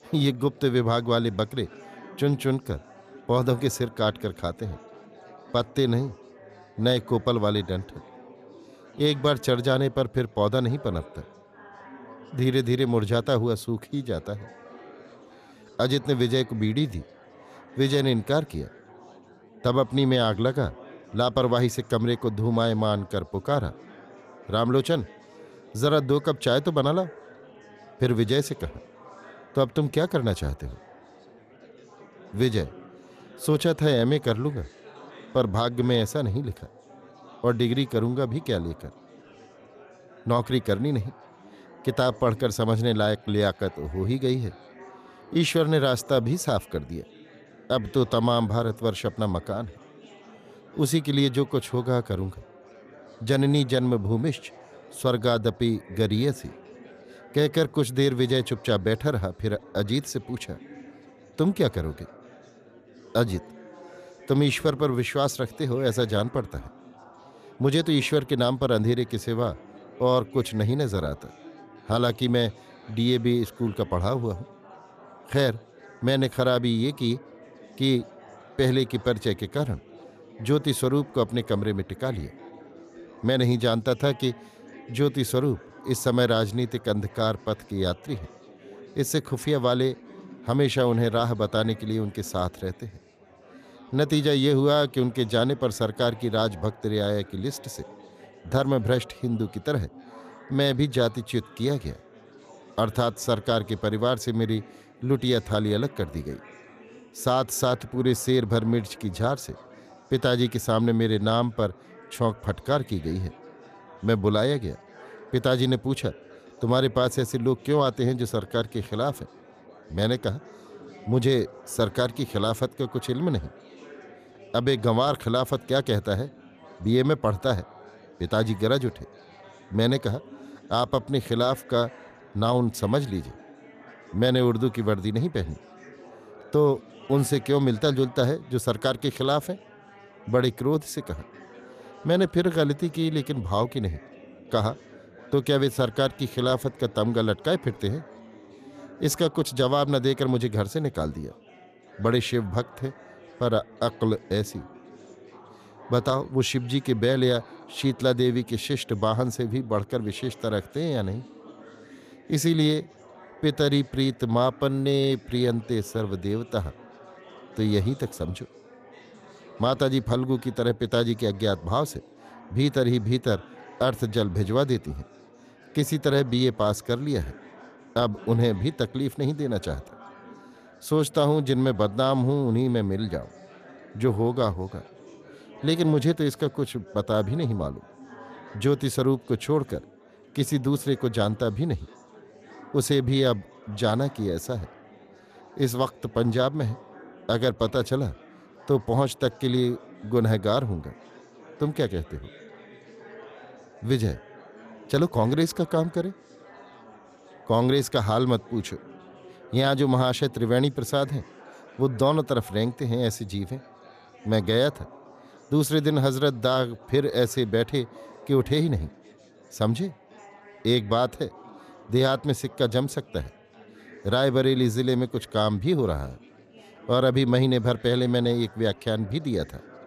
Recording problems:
chatter from many people; faint; throughout; 25 dB below the speech

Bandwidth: 14.5 kHz